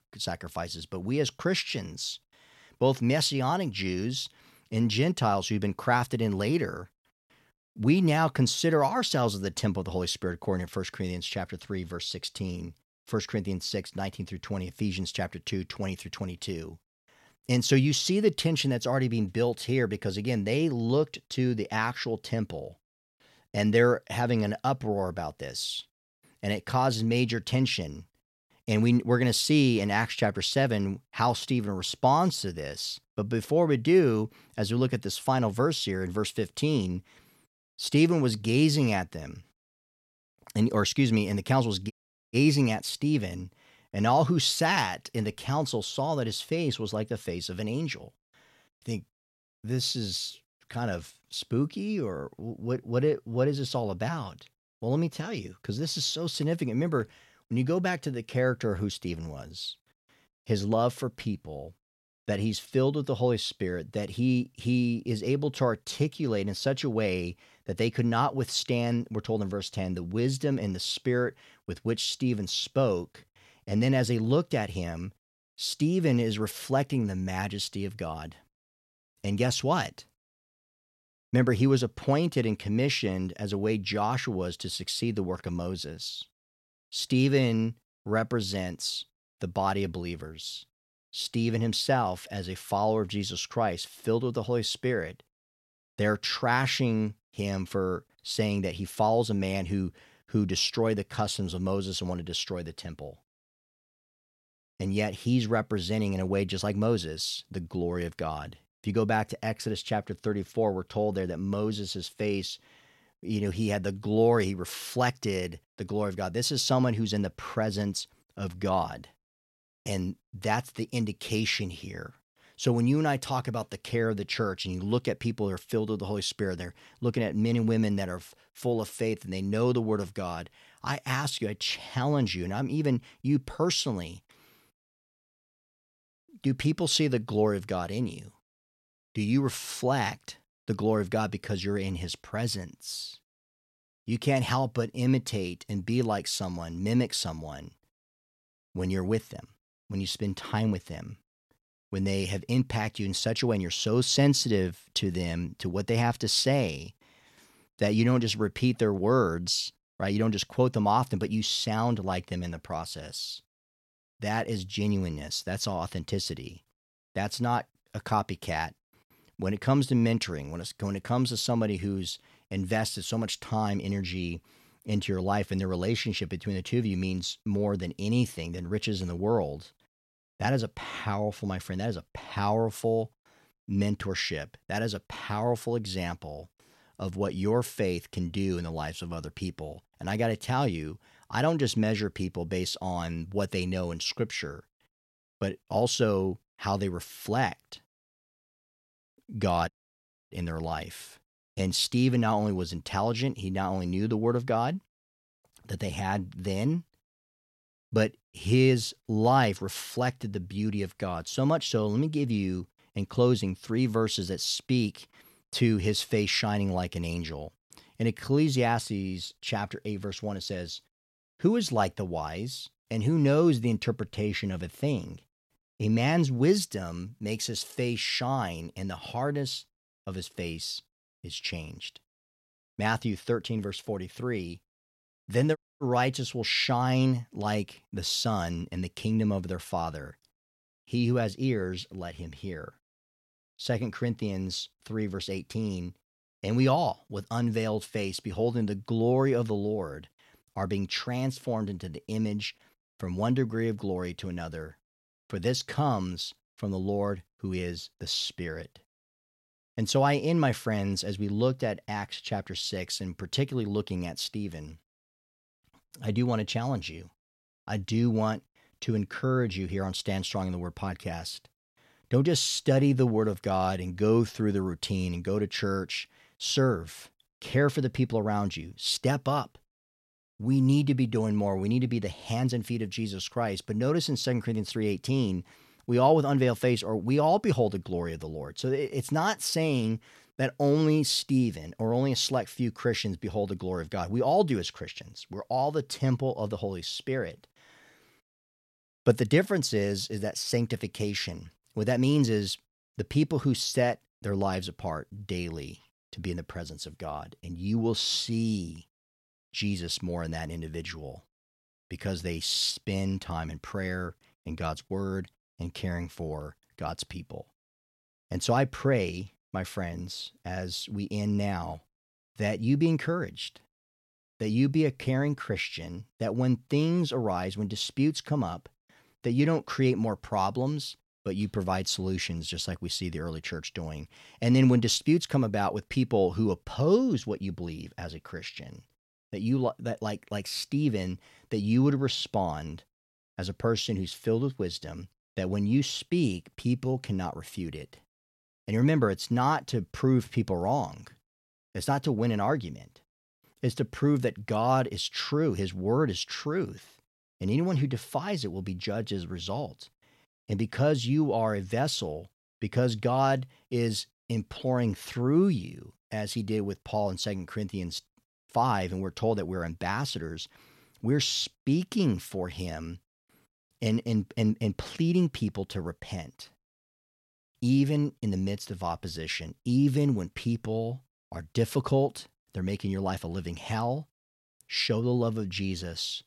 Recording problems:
audio cutting out; at 42 s, at 3:20 for 0.5 s and at 3:56

